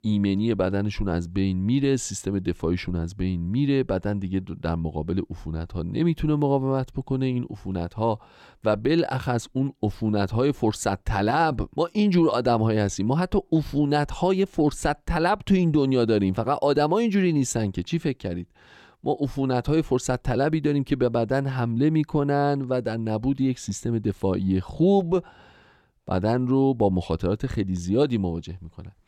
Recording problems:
none

